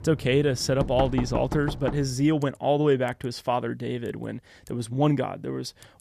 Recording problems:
household noises; loud; throughout; 9 dB below the speech

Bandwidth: 14.5 kHz